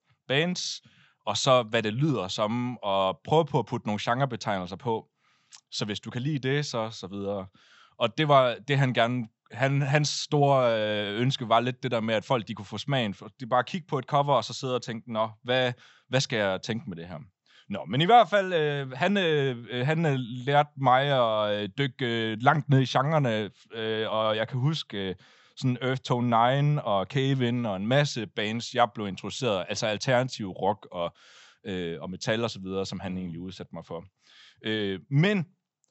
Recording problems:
high frequencies cut off; noticeable; nothing above 8 kHz

